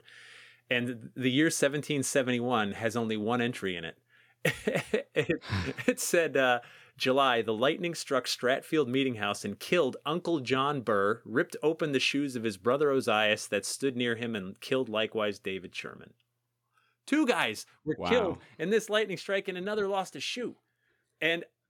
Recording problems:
none

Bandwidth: 17 kHz